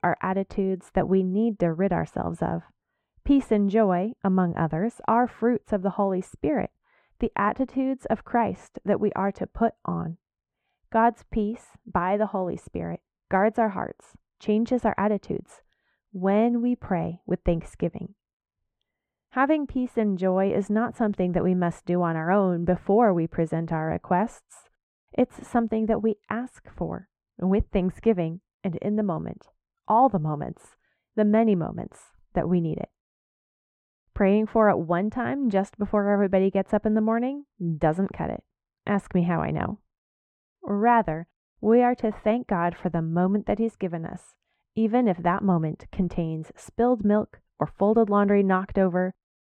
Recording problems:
muffled; very; fading above 3.5 kHz

